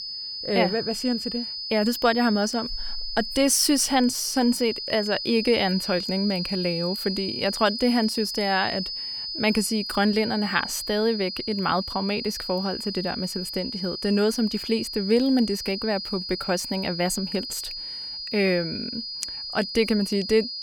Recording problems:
high-pitched whine; loud; throughout; 5 kHz, 6 dB below the speech

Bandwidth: 18 kHz